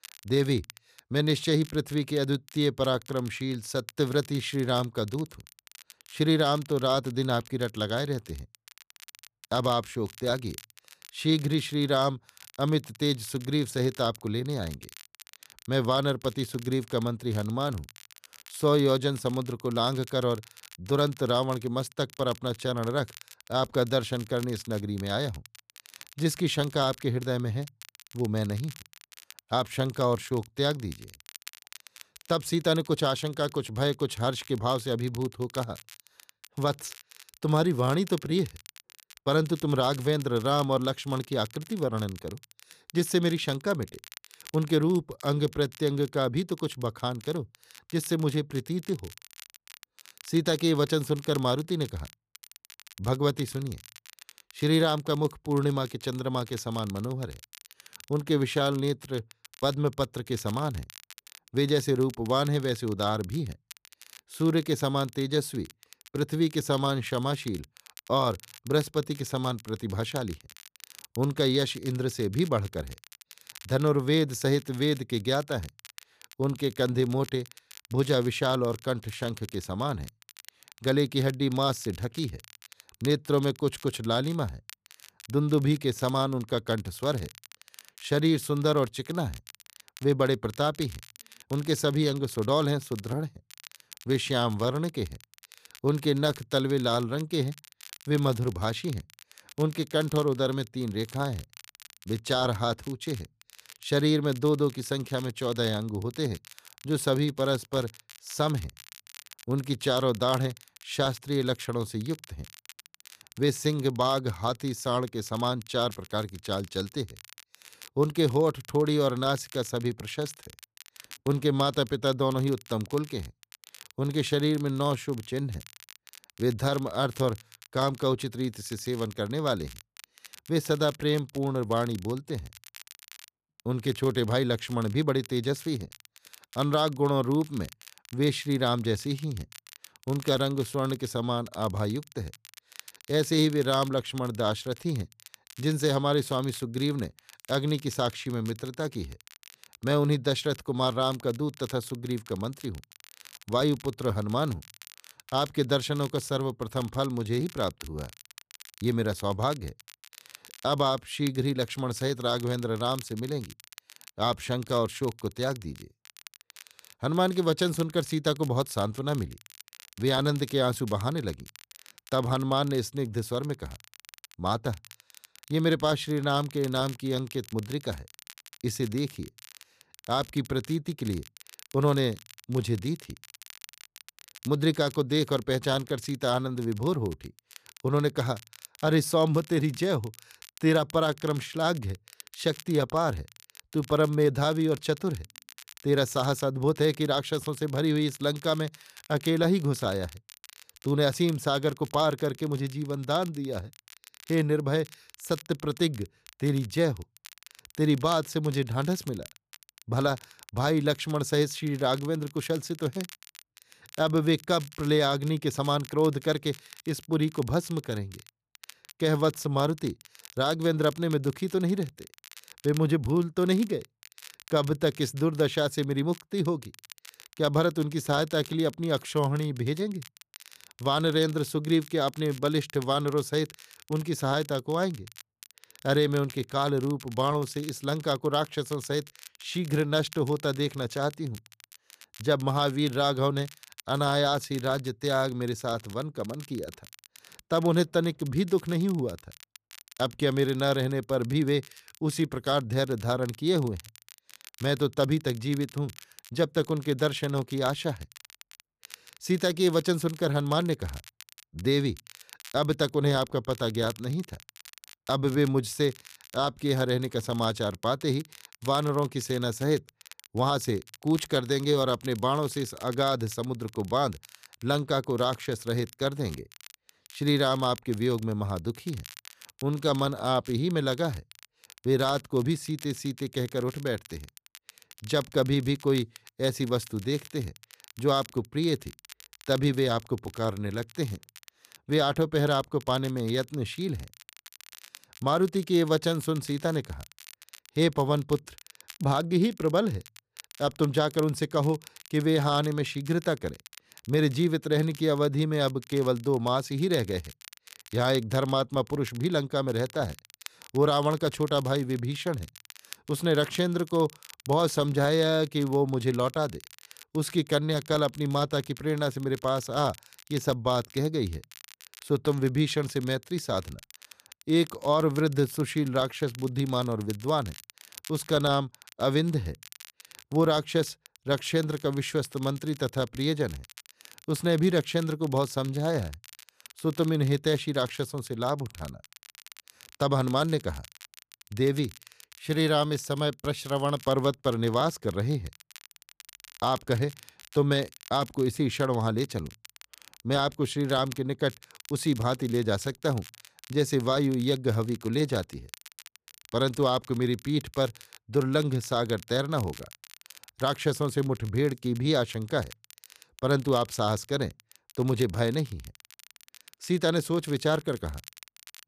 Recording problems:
crackle, like an old record; faint; 20 dB below the speech

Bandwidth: 14.5 kHz